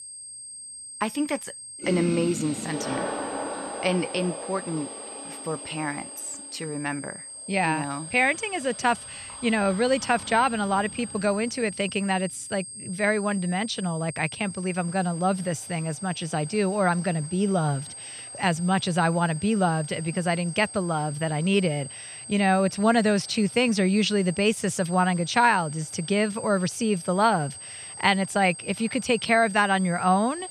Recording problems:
high-pitched whine; noticeable; throughout; 8.5 kHz, 10 dB below the speech
household noises; noticeable; throughout; 10 dB below the speech

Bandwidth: 14.5 kHz